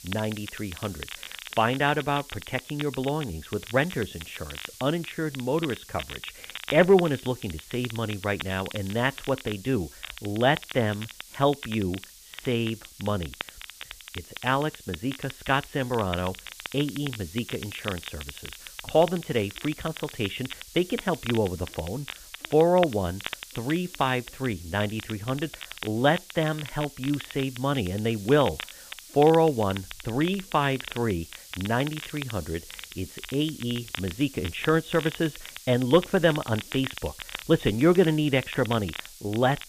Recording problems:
high frequencies cut off; severe; nothing above 4 kHz
hiss; noticeable; throughout; 20 dB below the speech
crackle, like an old record; noticeable; 15 dB below the speech

